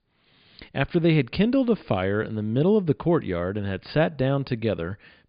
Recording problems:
high frequencies cut off; severe; nothing above 5 kHz

